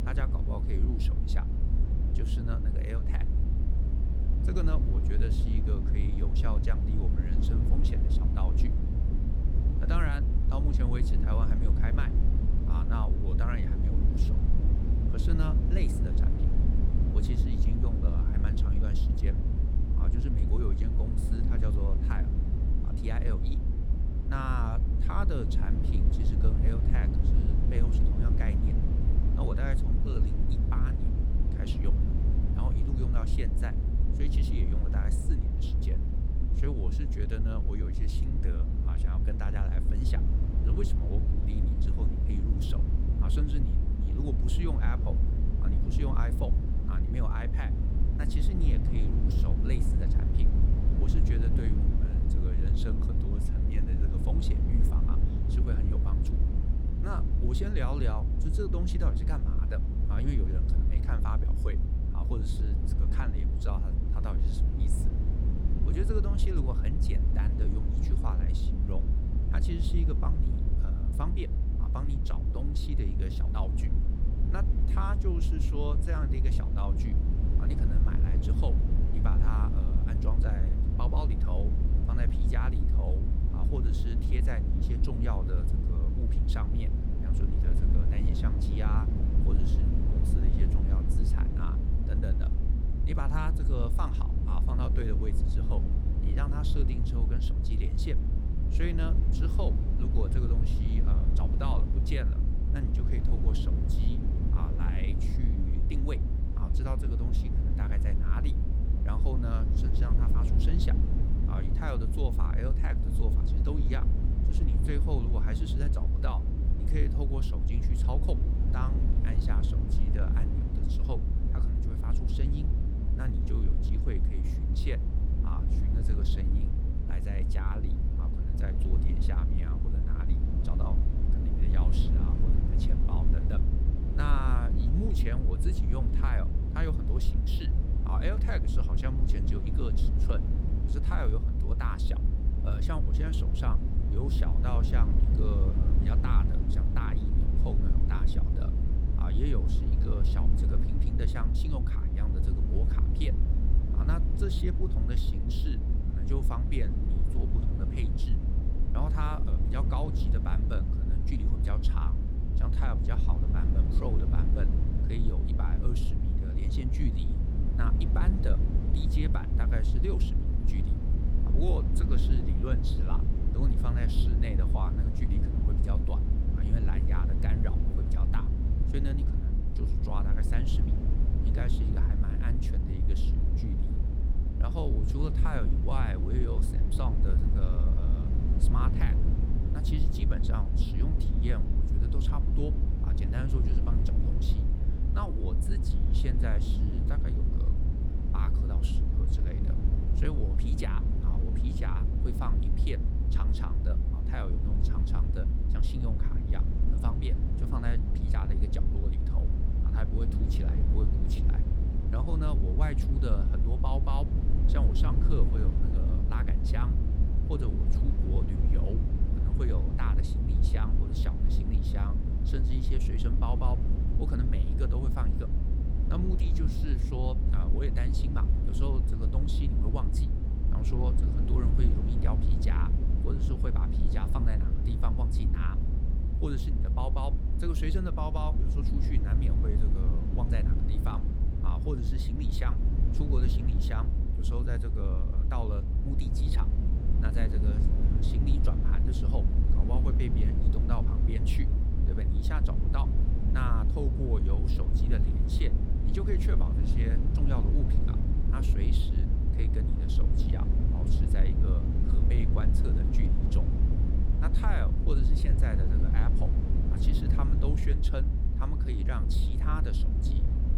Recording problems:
low rumble; loud; throughout; 1 dB below the speech

